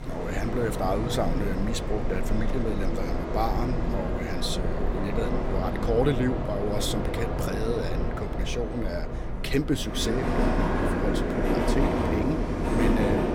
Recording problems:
train or aircraft noise; very loud; throughout; 2 dB above the speech

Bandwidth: 16.5 kHz